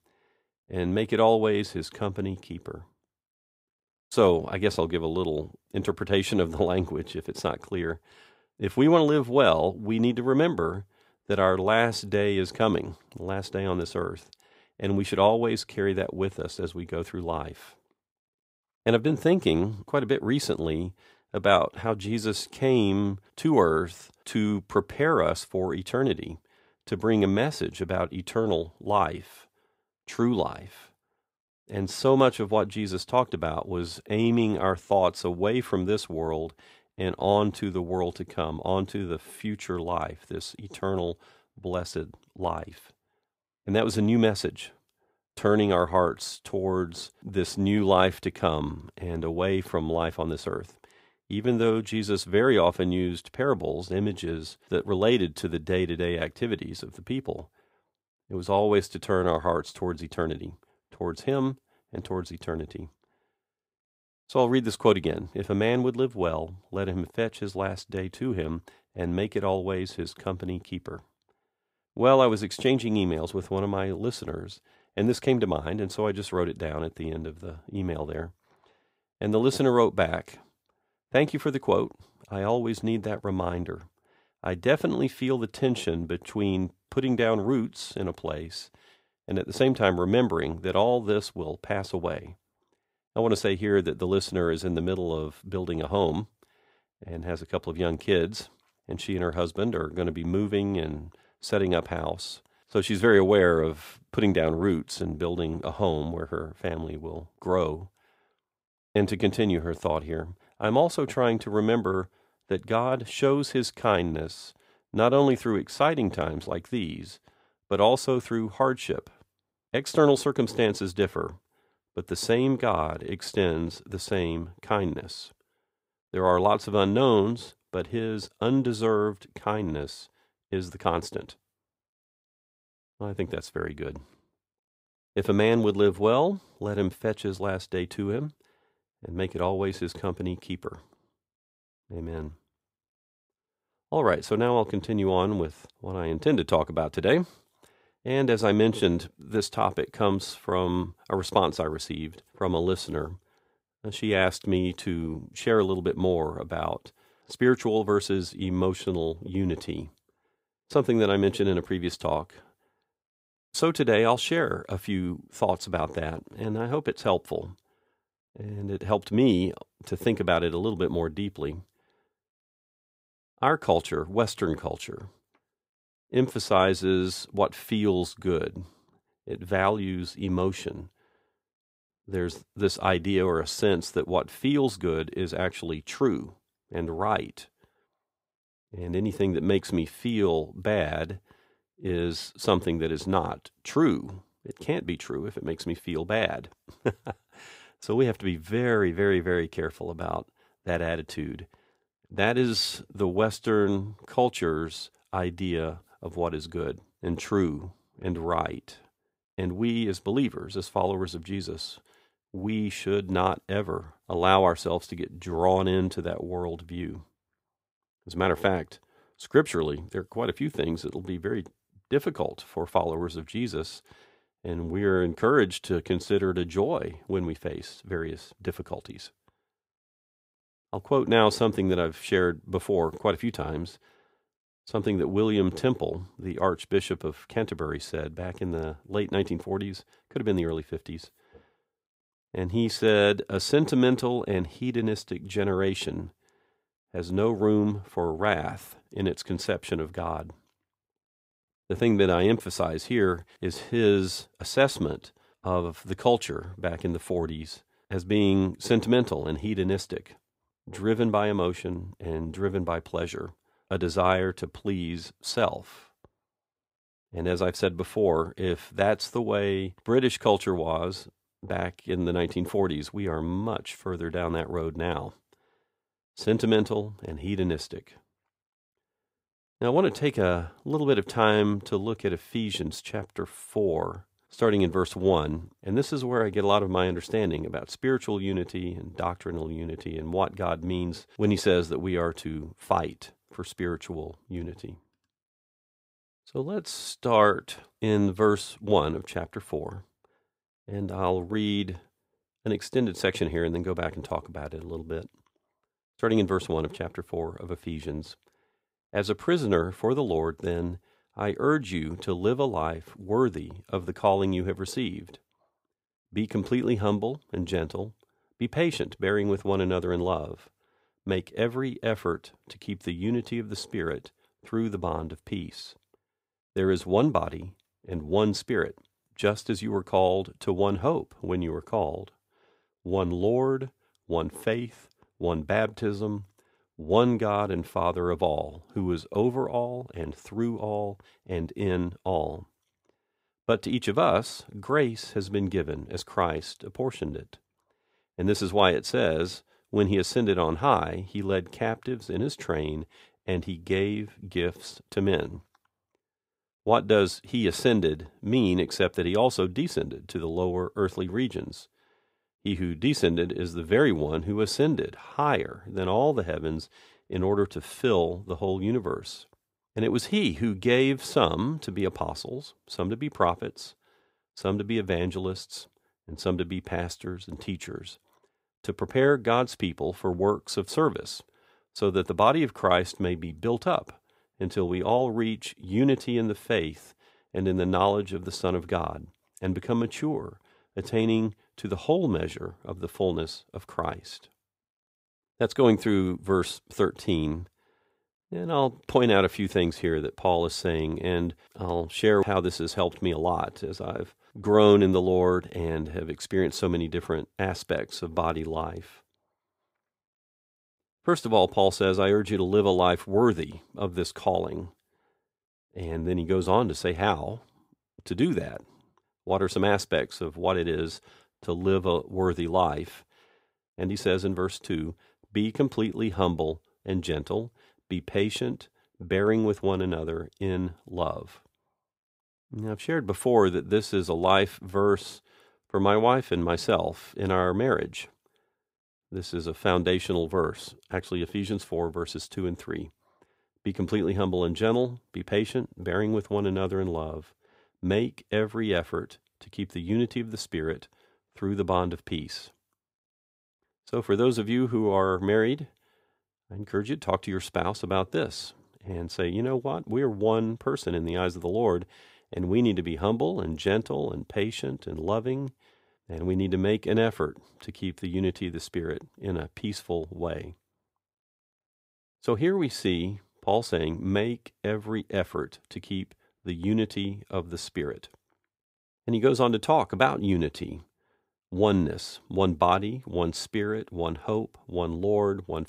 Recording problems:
none

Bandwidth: 15.5 kHz